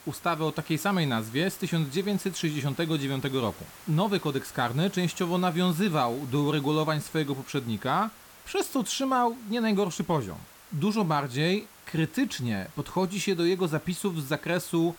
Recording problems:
hiss; noticeable; throughout; 20 dB below the speech

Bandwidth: 18 kHz